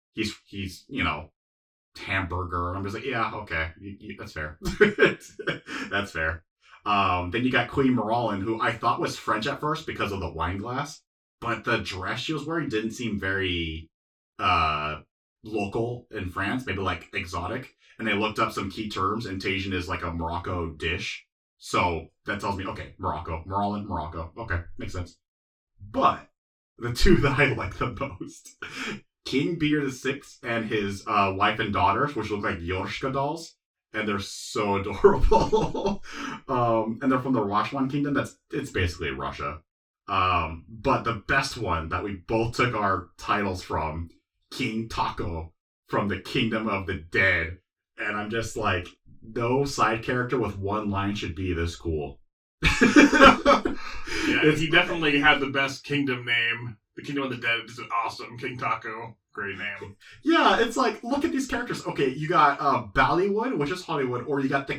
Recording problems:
off-mic speech; far
room echo; very slight; dies away in 0.2 s

